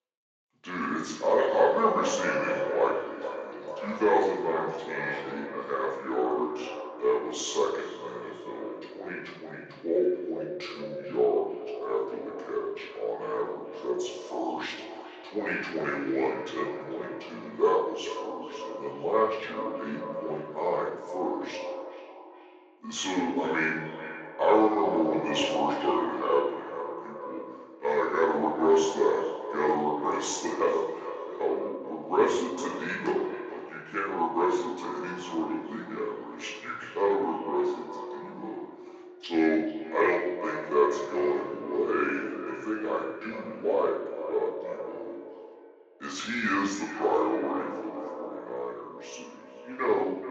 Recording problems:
echo of what is said; strong; throughout; 430 ms later, 10 dB below the speech
off-mic speech; far
wrong speed and pitch; too slow and too low; 0.7 times normal speed
room echo; noticeable; dies away in 0.7 s
thin; somewhat; fading below 300 Hz
garbled, watery; slightly

